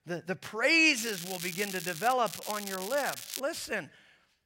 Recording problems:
crackling; loud; from 1 to 2 s and from 2.5 to 3.5 s; 9 dB below the speech

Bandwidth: 16 kHz